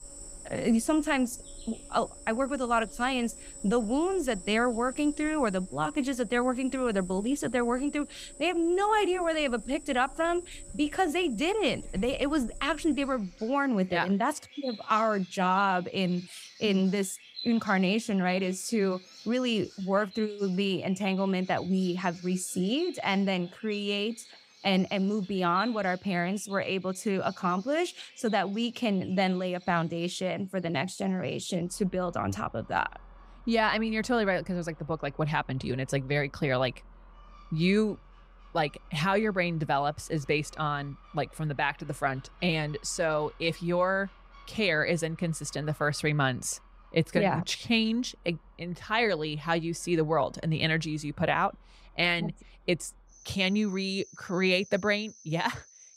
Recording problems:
animal sounds; noticeable; throughout; 20 dB below the speech

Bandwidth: 15.5 kHz